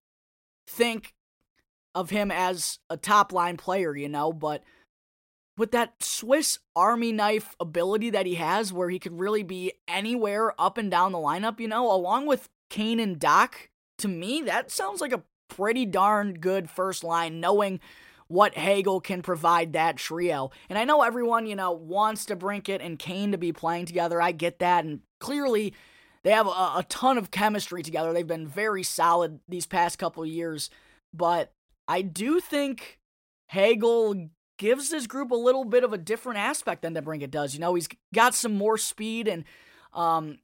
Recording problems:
none

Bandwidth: 16 kHz